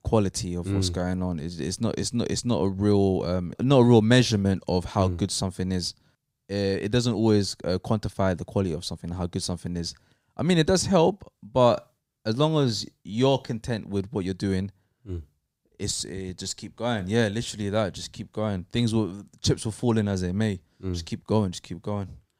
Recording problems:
none

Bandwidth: 15.5 kHz